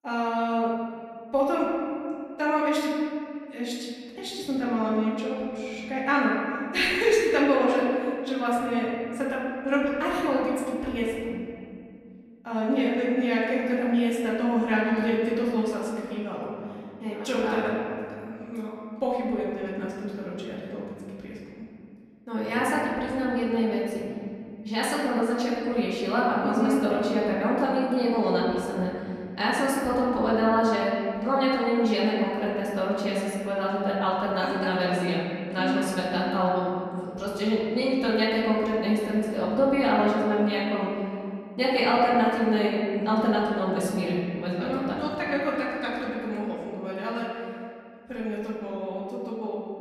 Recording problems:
off-mic speech; far
room echo; noticeable; dies away in 2.2 s

